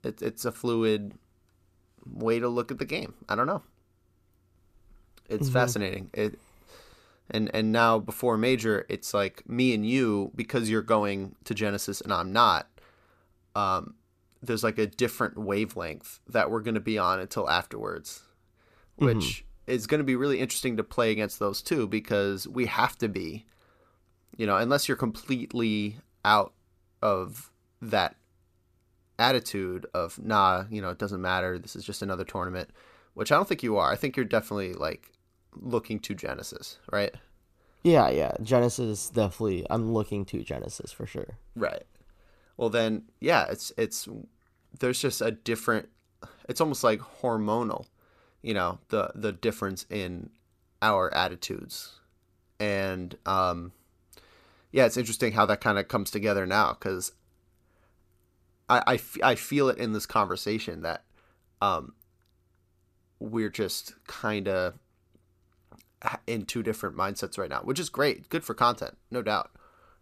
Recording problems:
none

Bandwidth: 14.5 kHz